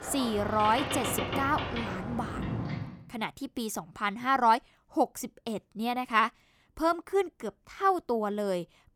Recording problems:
train or aircraft noise; loud; until 2.5 s; 5 dB below the speech

